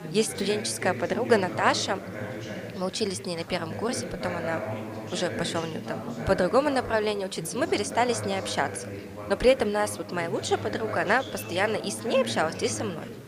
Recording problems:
background chatter; loud; throughout; 3 voices, 9 dB below the speech
hiss; faint; throughout; 25 dB below the speech

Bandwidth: 15 kHz